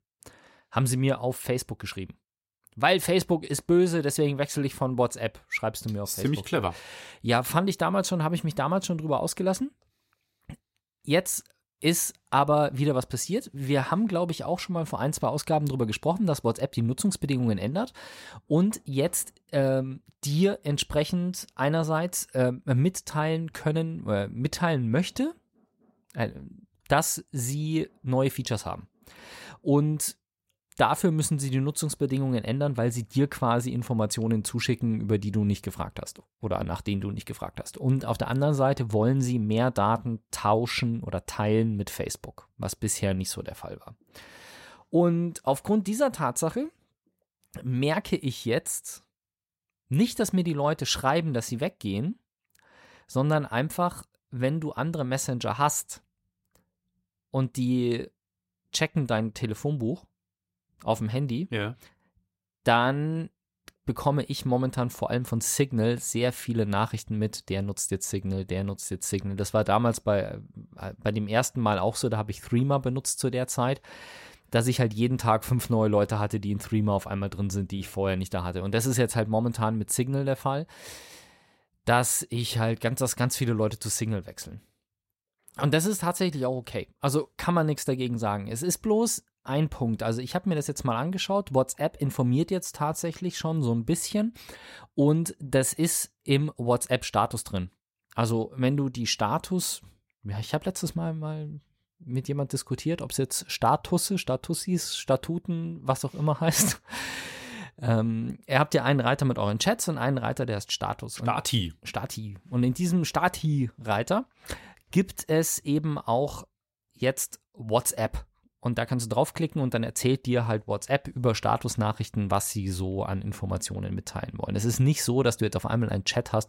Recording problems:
none

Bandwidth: 16 kHz